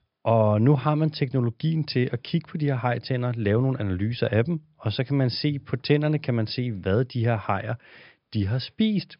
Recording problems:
high frequencies cut off; noticeable; nothing above 5.5 kHz

